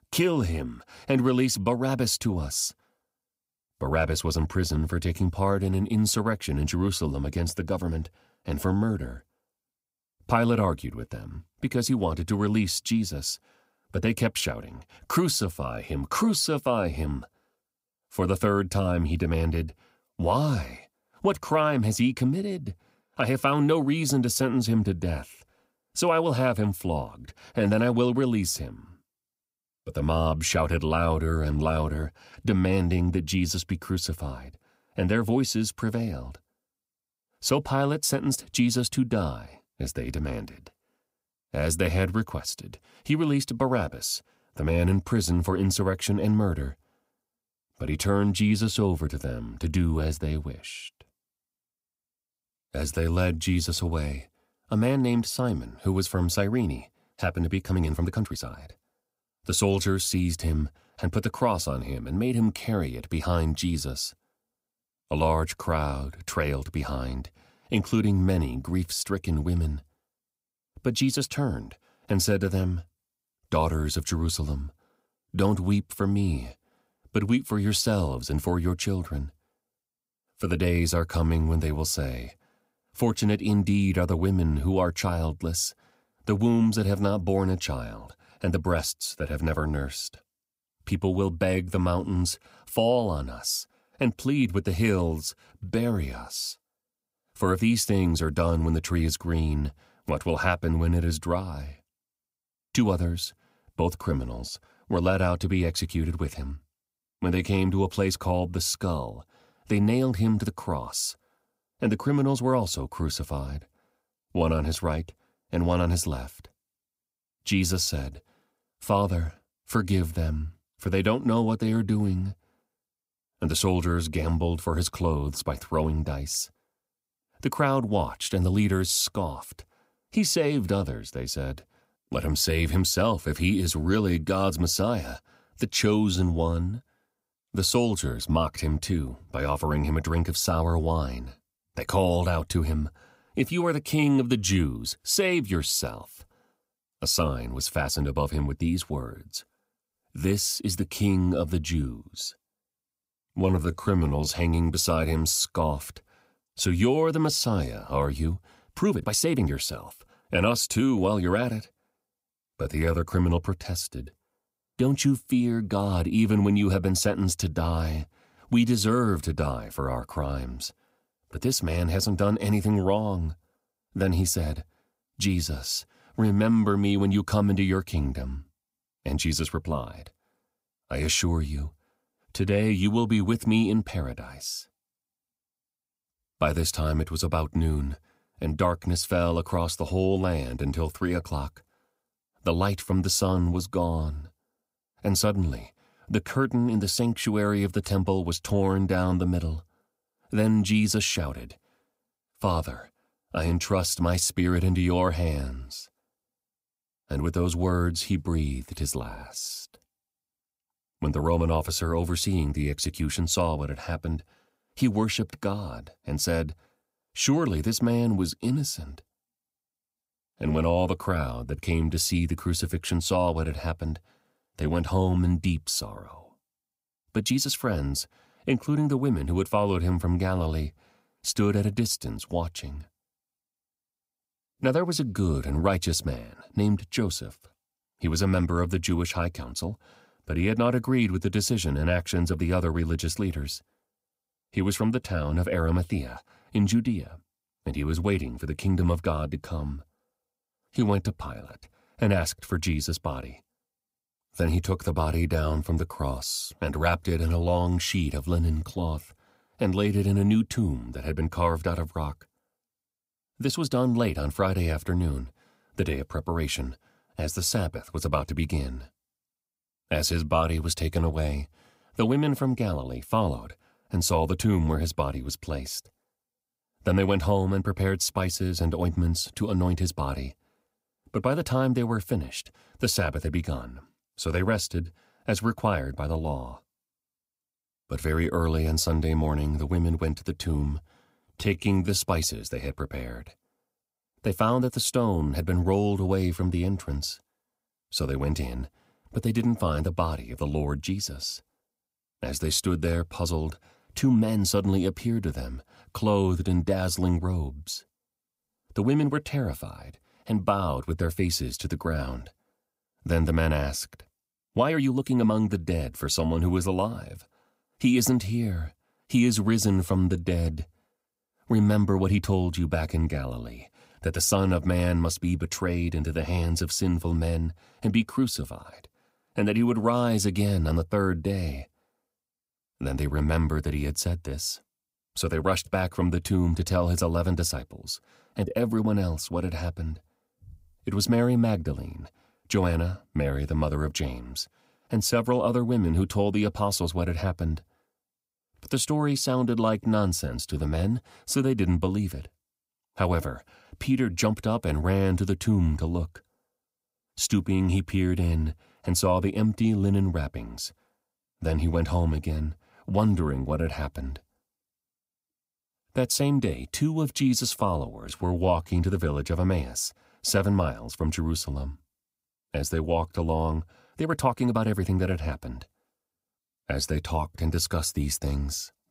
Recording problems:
uneven, jittery; strongly; from 58 s to 6:15

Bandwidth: 15.5 kHz